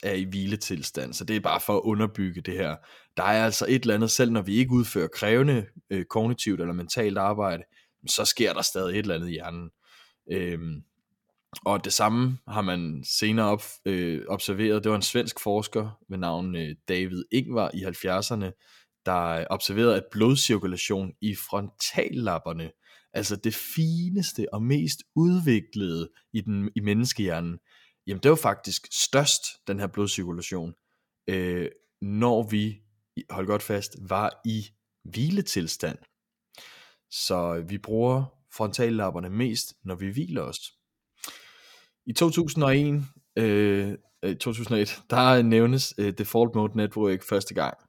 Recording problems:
none

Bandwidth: 17.5 kHz